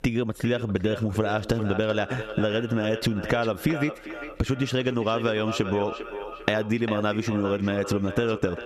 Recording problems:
echo of what is said; strong; throughout; 400 ms later, 10 dB below the speech
squashed, flat; somewhat

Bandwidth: 14.5 kHz